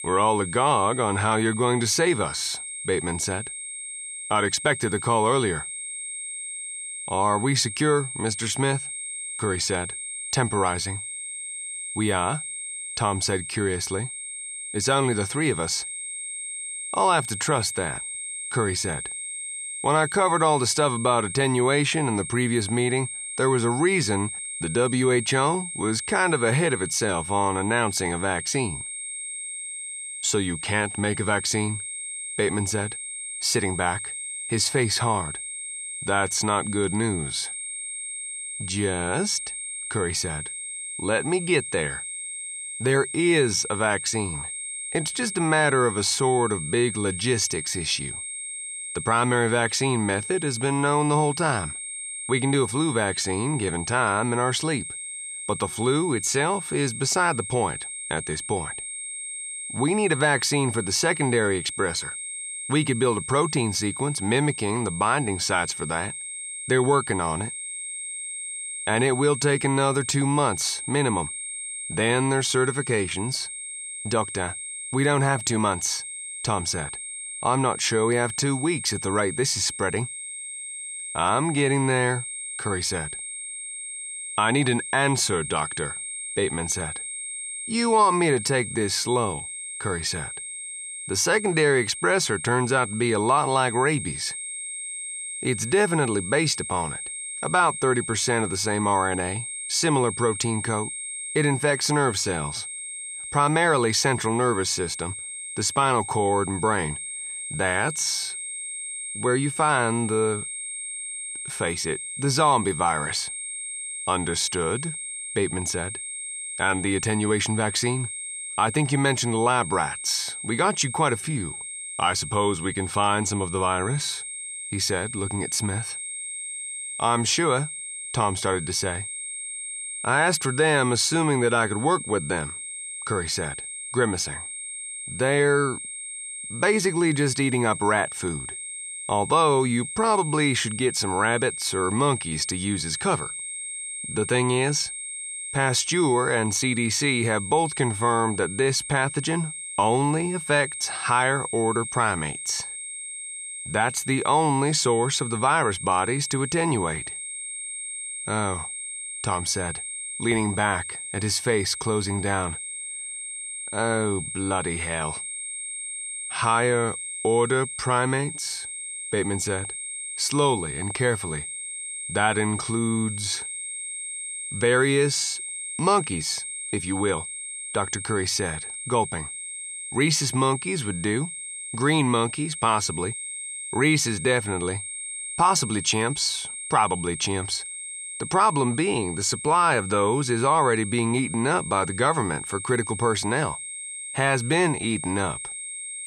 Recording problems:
high-pitched whine; loud; throughout; 8.5 kHz, 7 dB below the speech

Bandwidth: 14 kHz